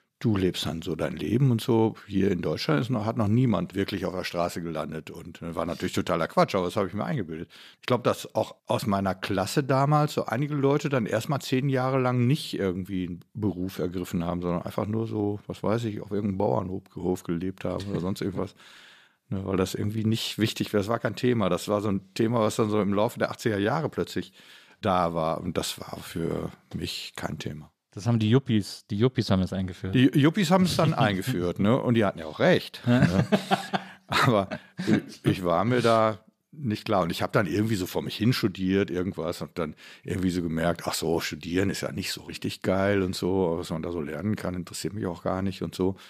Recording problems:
none

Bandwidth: 14.5 kHz